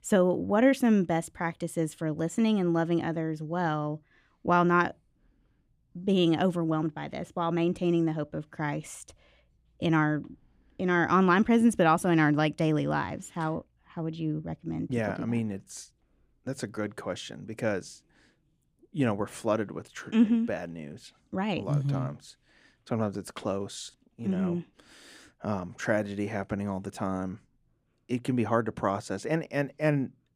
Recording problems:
none

